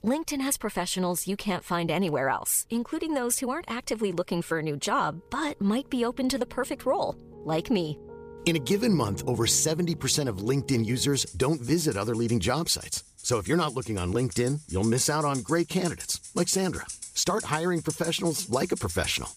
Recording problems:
background music; noticeable; throughout; 15 dB below the speech

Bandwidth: 15 kHz